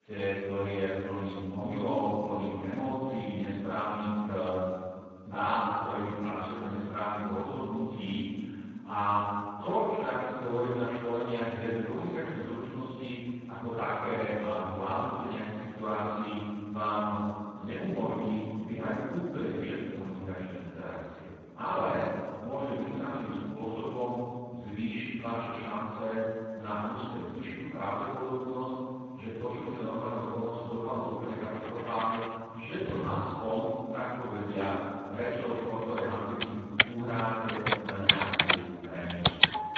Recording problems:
room echo; strong; dies away in 2.1 s
off-mic speech; far
garbled, watery; badly; nothing above 7.5 kHz
household noises; very loud; from 31 s on; 5 dB above the speech

